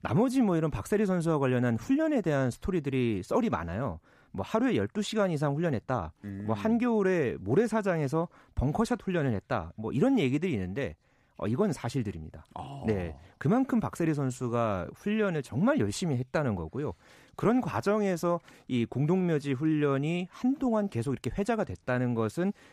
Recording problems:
none

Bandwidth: 14.5 kHz